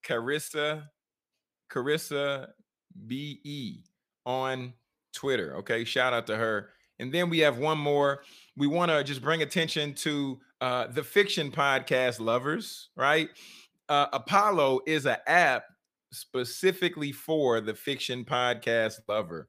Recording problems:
none

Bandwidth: 15 kHz